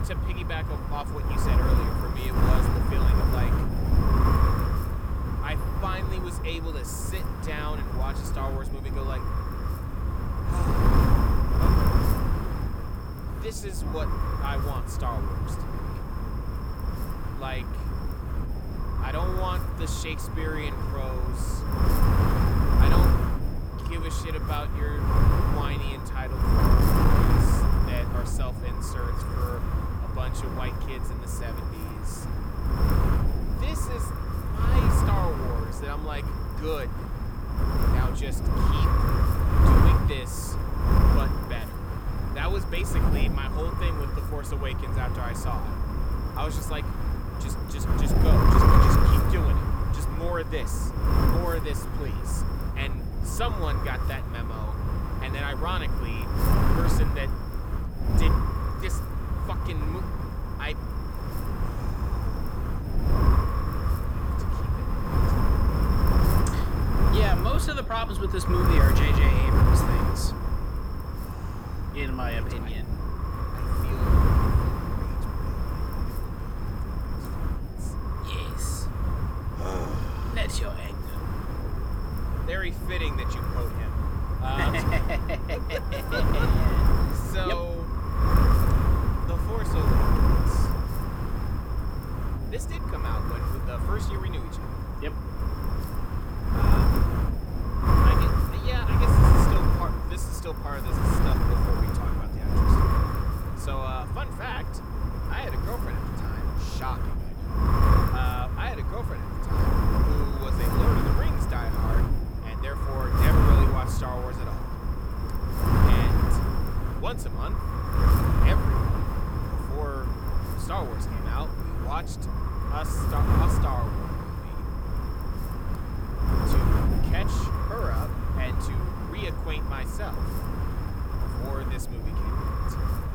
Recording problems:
wind noise on the microphone; heavy; 2 dB above the speech

